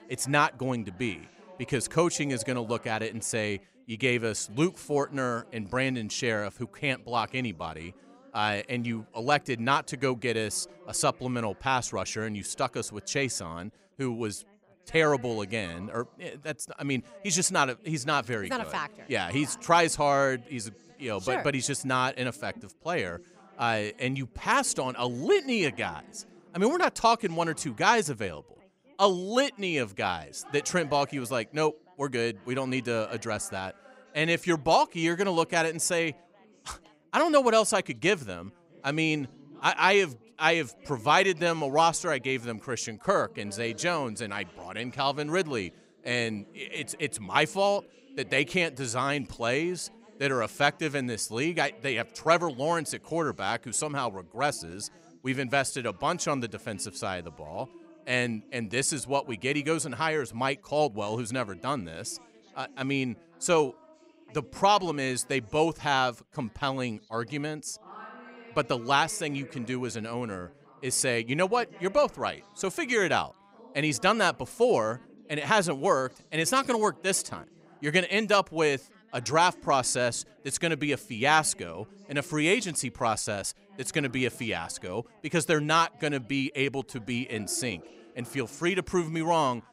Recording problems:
background chatter; faint; throughout; 3 voices, 25 dB below the speech

